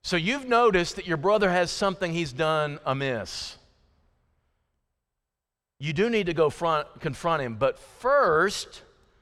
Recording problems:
none

